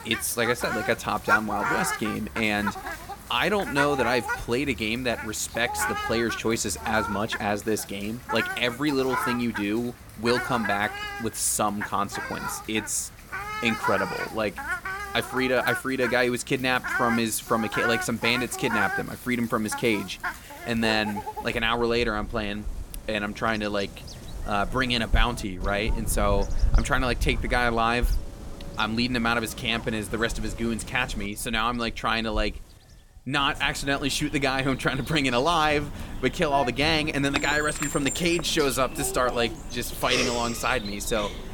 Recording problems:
animal sounds; loud; throughout; 7 dB below the speech

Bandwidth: 18 kHz